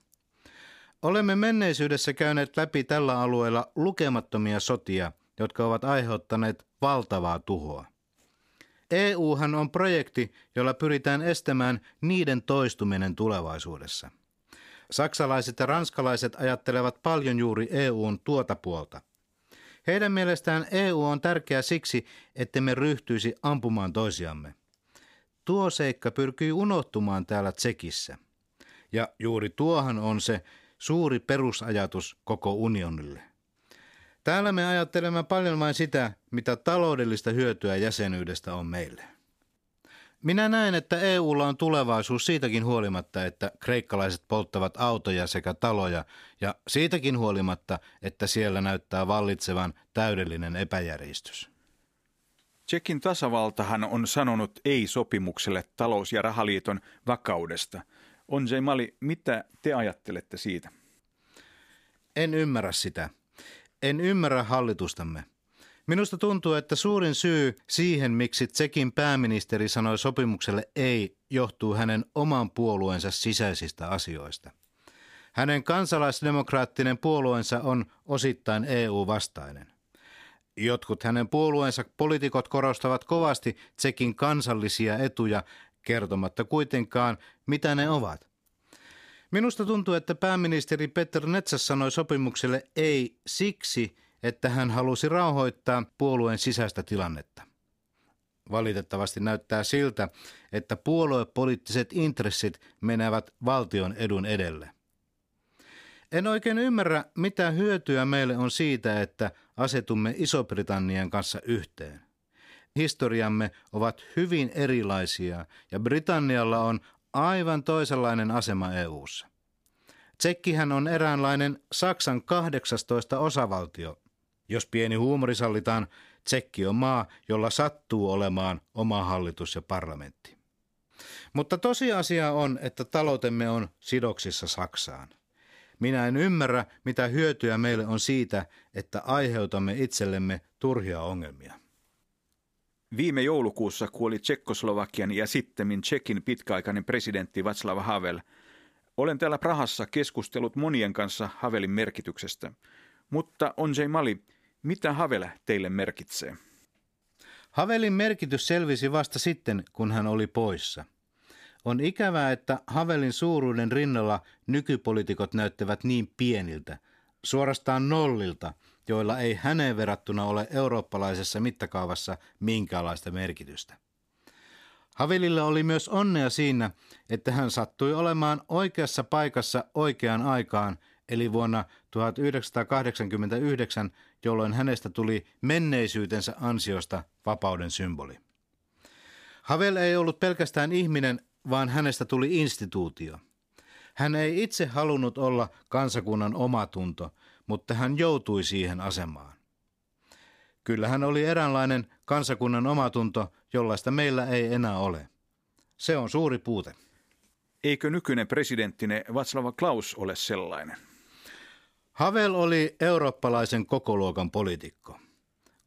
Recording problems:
none

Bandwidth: 15 kHz